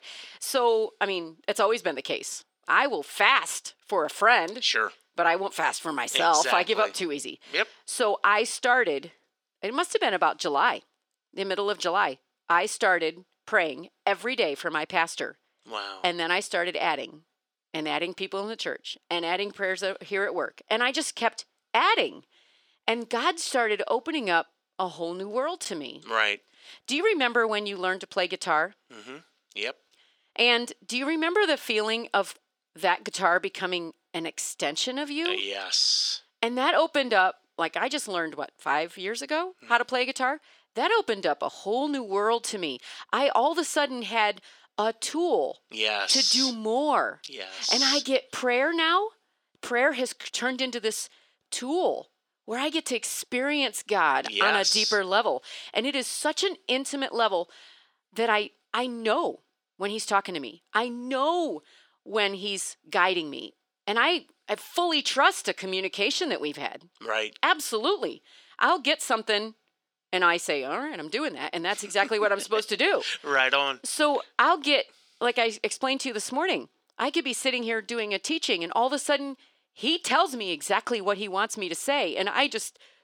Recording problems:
thin; somewhat; fading below 400 Hz

